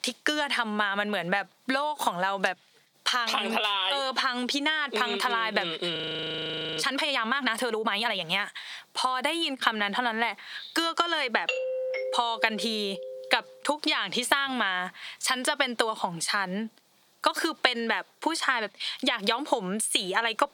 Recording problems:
squashed, flat; heavily
thin; very slightly; fading below 500 Hz
audio freezing; at 6 s for 1 s
doorbell; noticeable; from 11 to 13 s; peak 2 dB below the speech

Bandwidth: 18 kHz